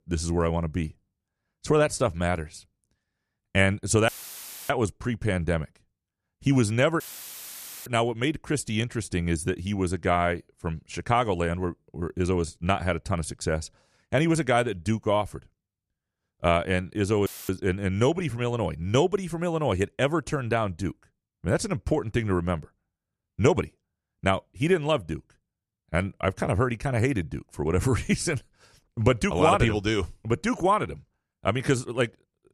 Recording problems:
audio cutting out; filled with static; at 4 s for 0.5 s, at 7 s for 1 s and at 17 s

